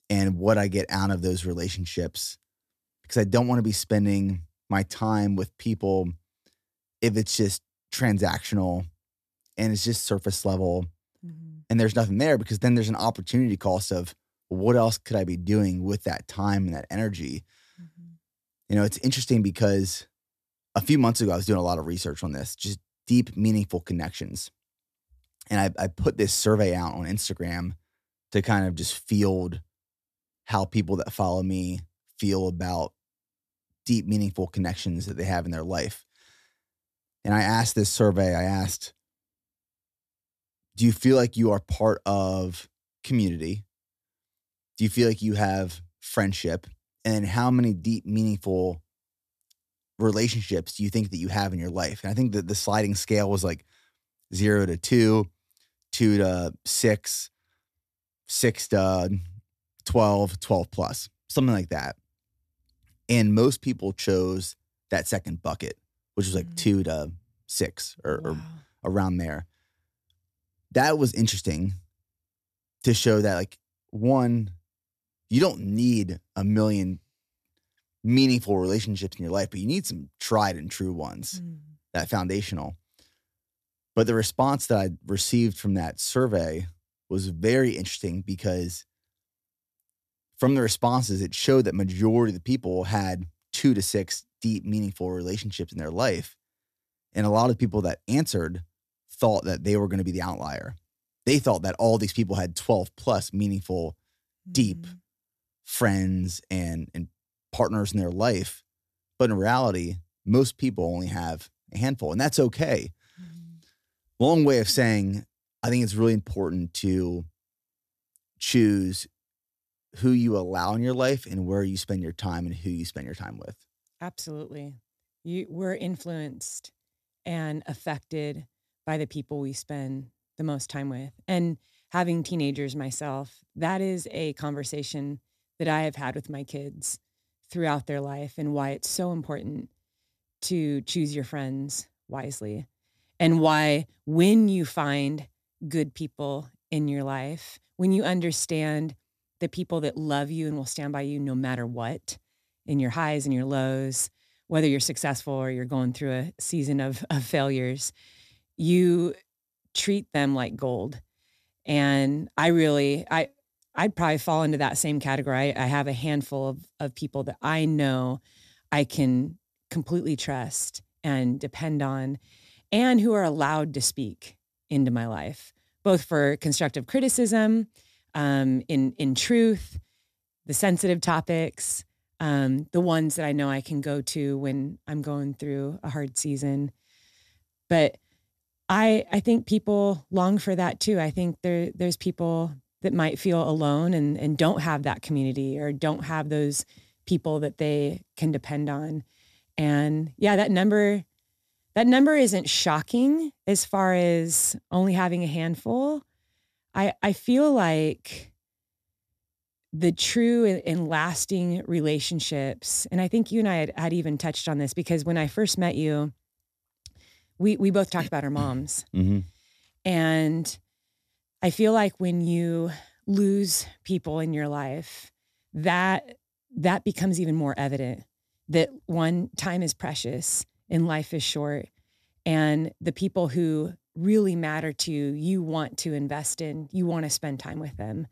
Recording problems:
none

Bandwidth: 14.5 kHz